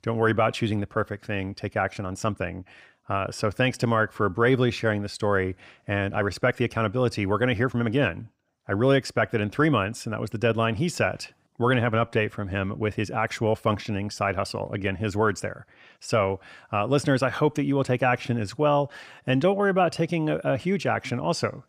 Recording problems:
uneven, jittery; strongly; from 2 to 20 s

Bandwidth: 15.5 kHz